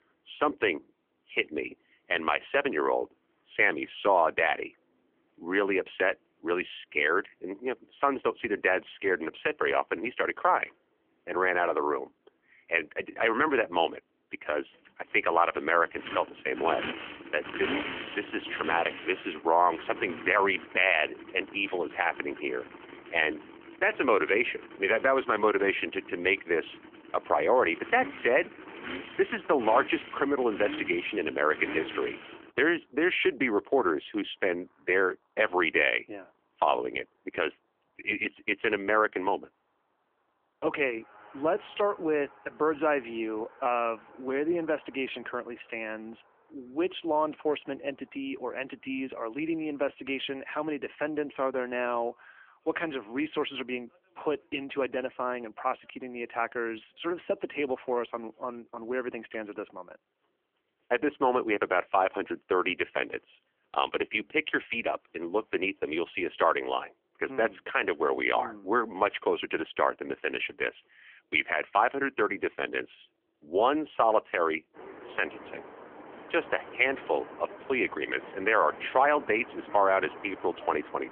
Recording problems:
phone-call audio; nothing above 3 kHz
traffic noise; noticeable; throughout; 15 dB below the speech

